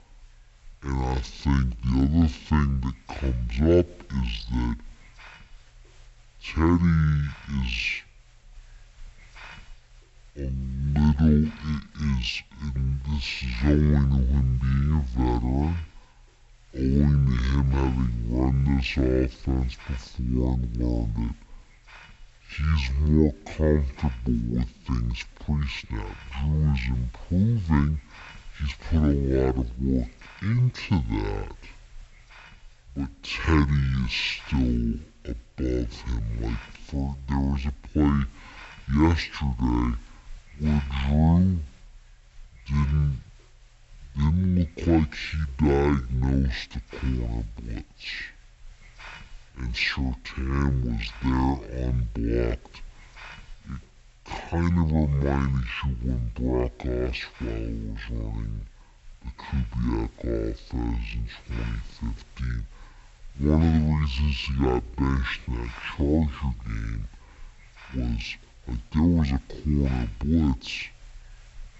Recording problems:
wrong speed and pitch; too slow and too low; 0.5 times normal speed
high frequencies cut off; slight; nothing above 8 kHz
hiss; faint; throughout; 25 dB below the speech

